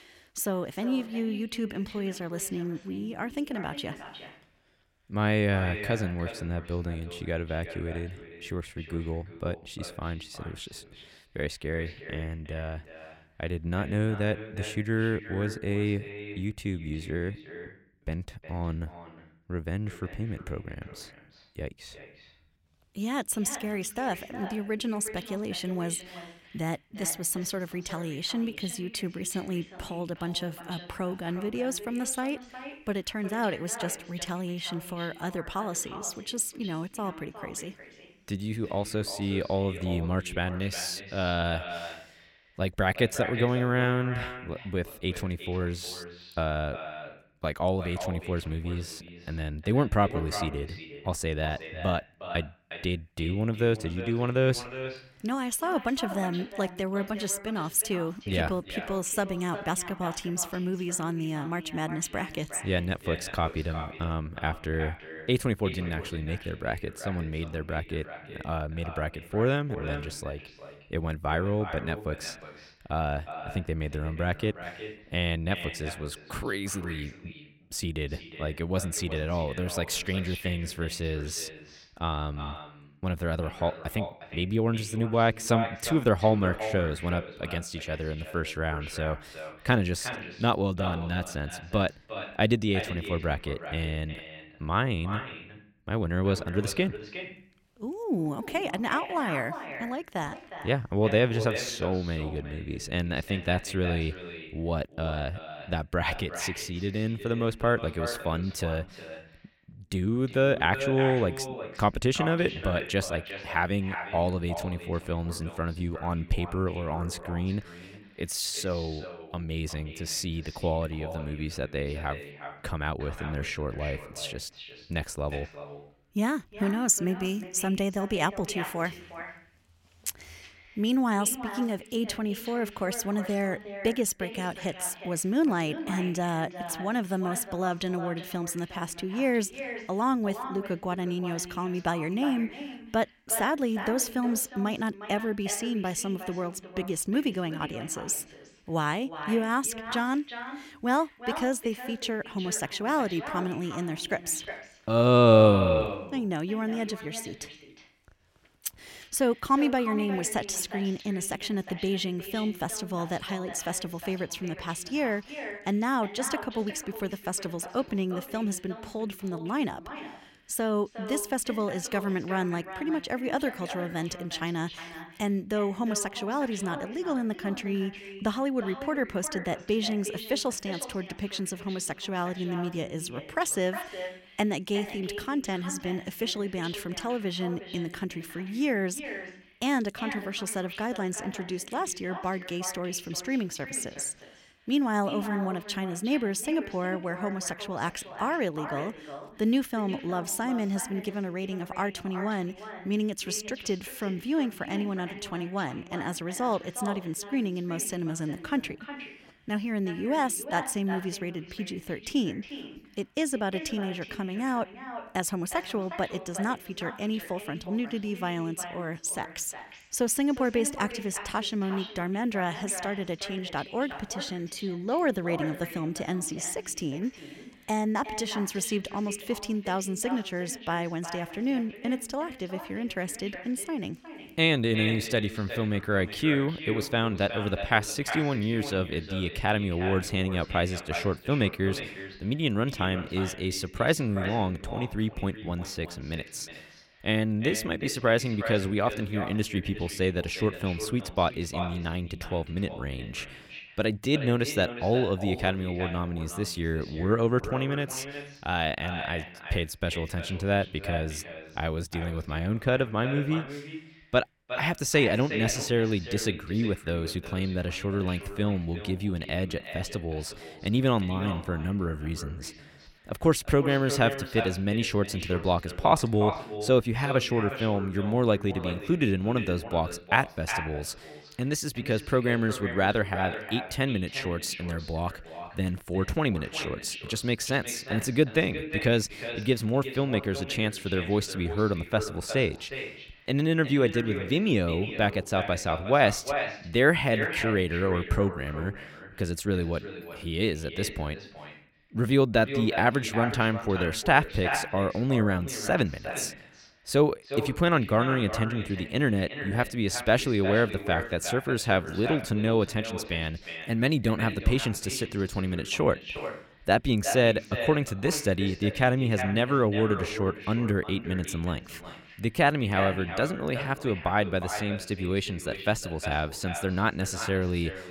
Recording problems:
echo of what is said; strong; throughout; 360 ms later, 10 dB below the speech

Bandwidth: 16.5 kHz